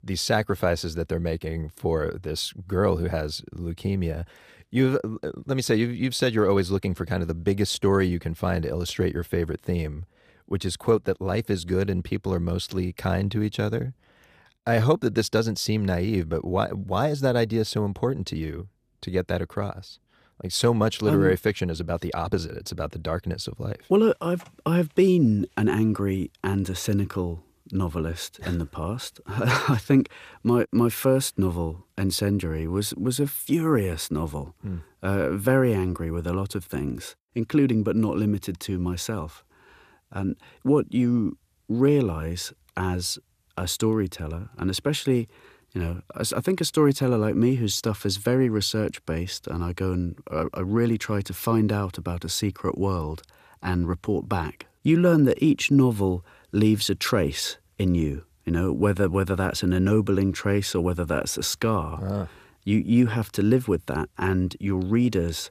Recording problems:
none

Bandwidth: 15 kHz